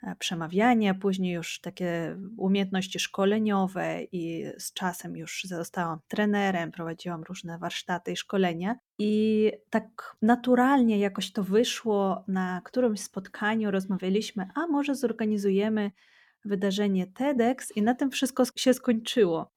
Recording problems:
none

